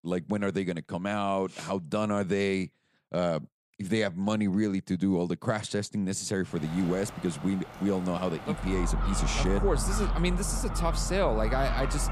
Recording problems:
animal sounds; loud; from 6.5 s on; 4 dB below the speech

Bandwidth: 15 kHz